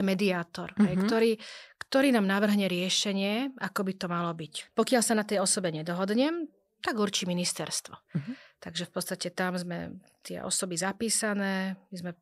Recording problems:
abrupt cut into speech; at the start

